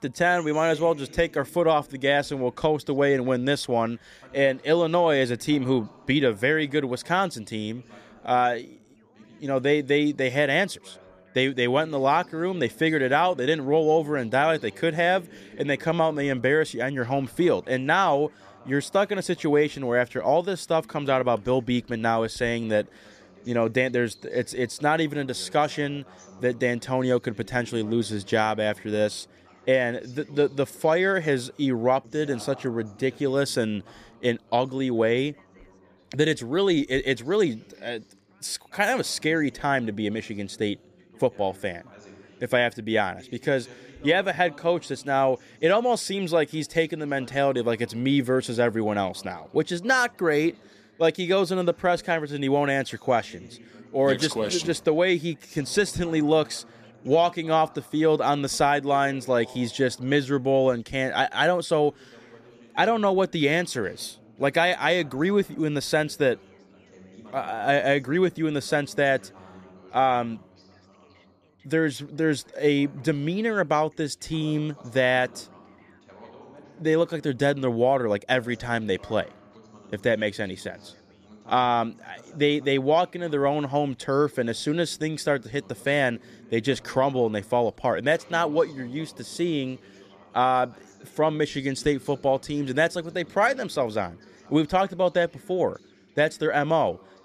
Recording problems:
background chatter; faint; throughout; 2 voices, 25 dB below the speech

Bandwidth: 14.5 kHz